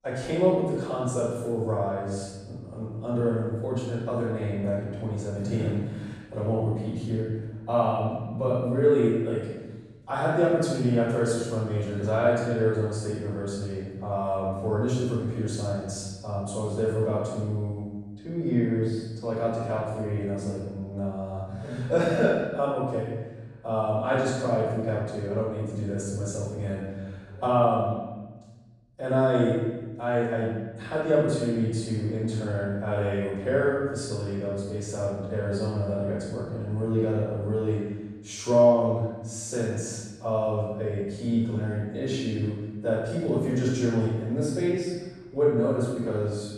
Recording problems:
room echo; strong; dies away in 1.2 s
off-mic speech; far

